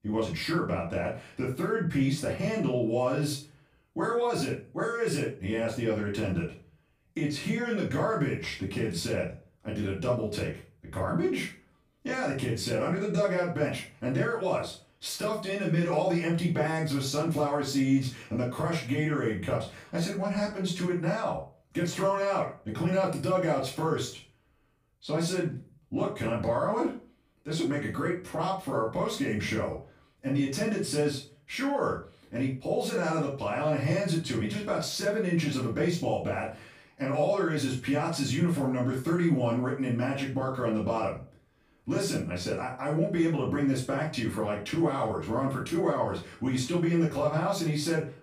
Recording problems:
off-mic speech; far
room echo; slight; dies away in 0.3 s

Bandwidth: 15 kHz